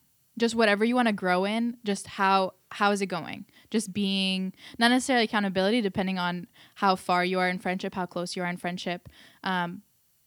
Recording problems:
none

